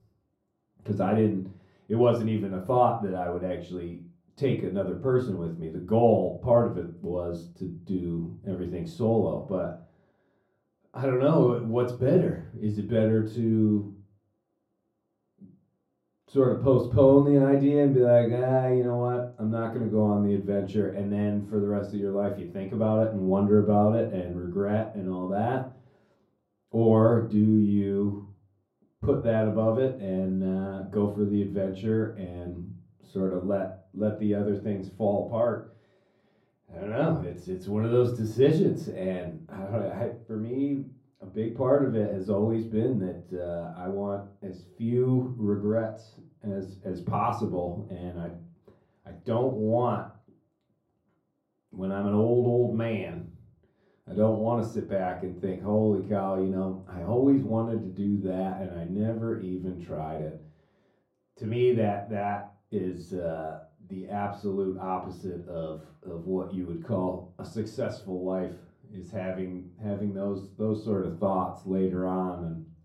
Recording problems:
off-mic speech; far
muffled; very; fading above 1 kHz
room echo; very slight; dies away in 0.3 s

